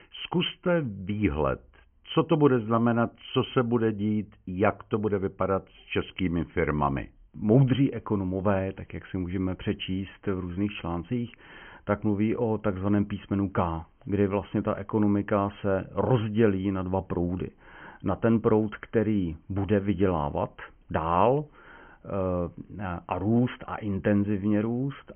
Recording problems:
high frequencies cut off; severe; nothing above 3 kHz

